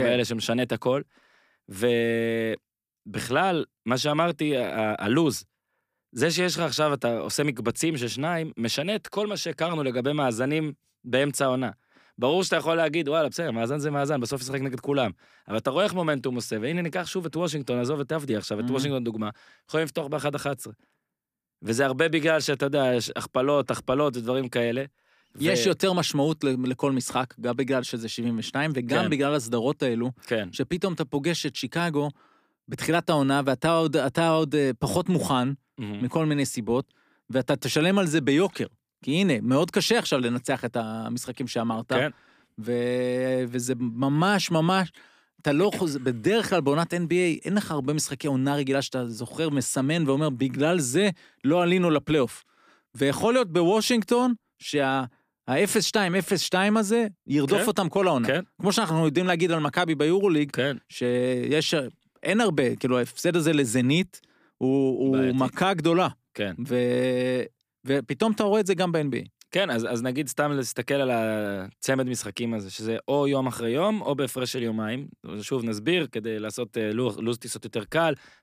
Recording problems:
abrupt cut into speech; at the start

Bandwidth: 15 kHz